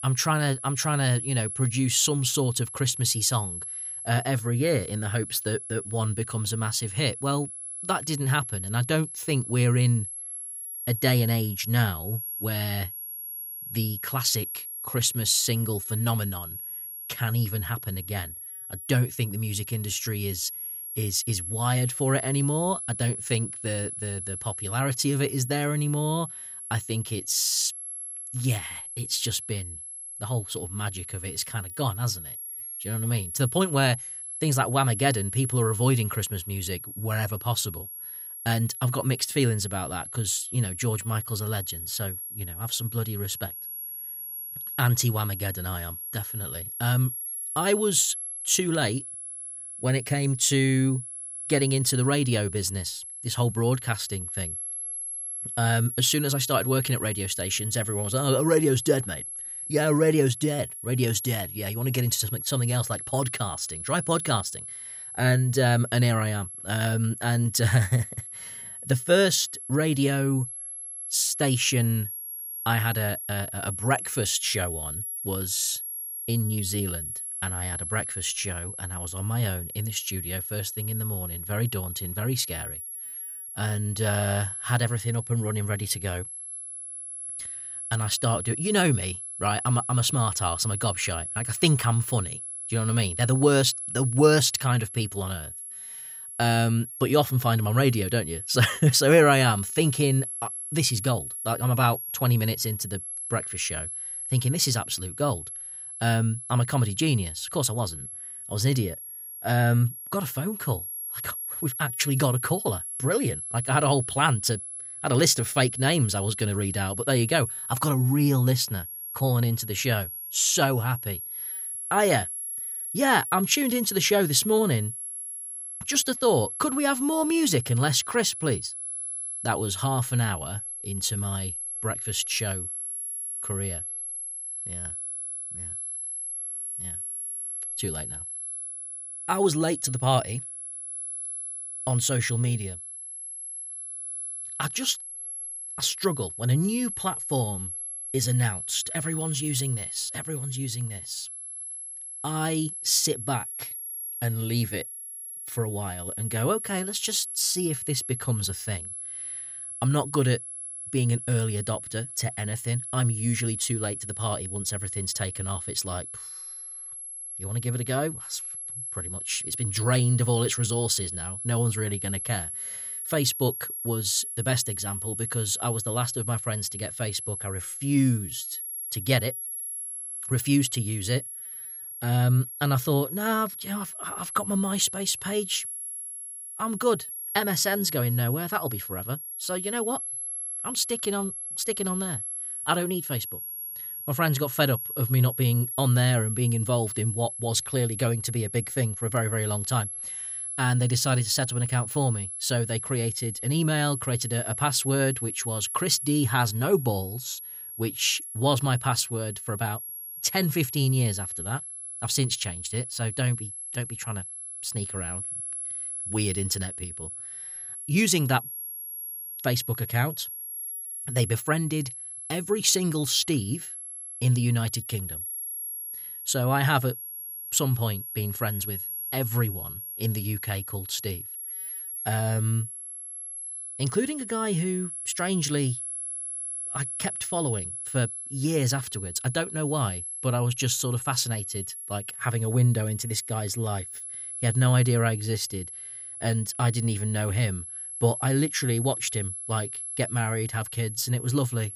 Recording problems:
high-pitched whine; loud; throughout; 11 kHz, 7 dB below the speech

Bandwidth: 15.5 kHz